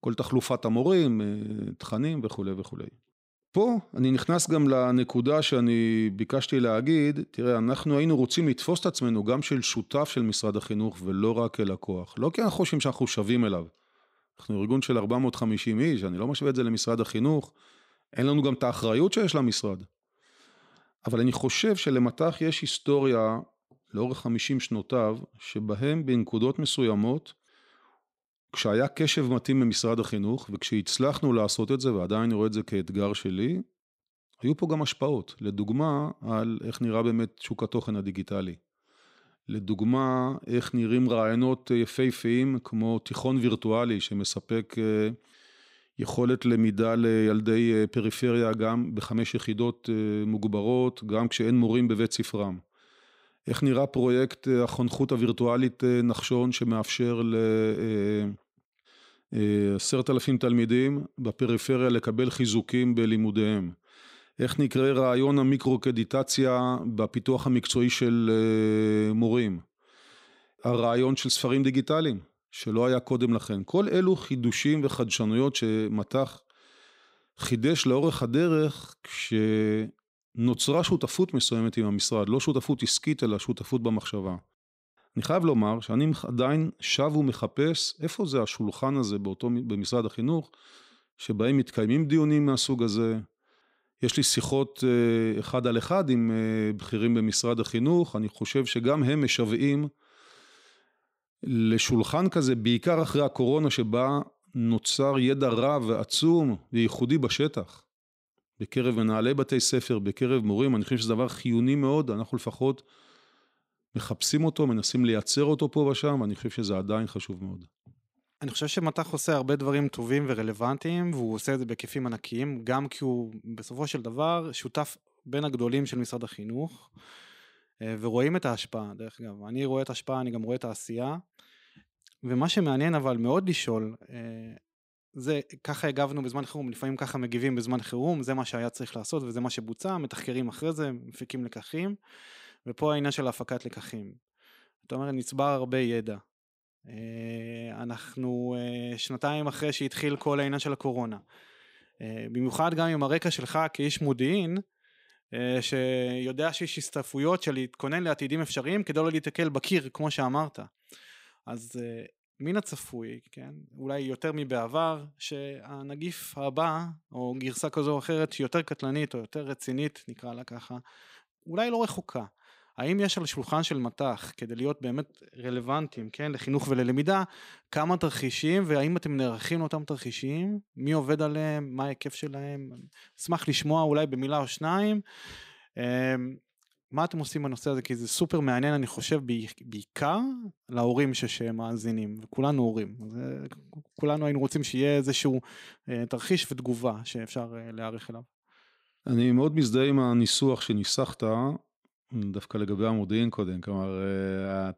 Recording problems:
none

